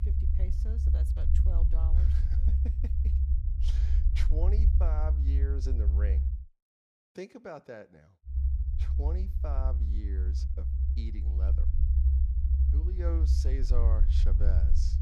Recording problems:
low rumble; loud; until 6.5 s and from 8.5 s on; 2 dB below the speech

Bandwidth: 15 kHz